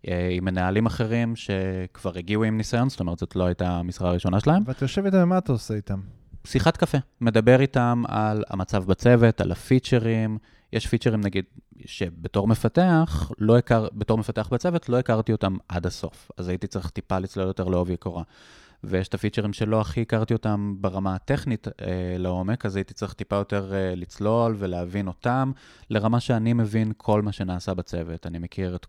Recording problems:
none

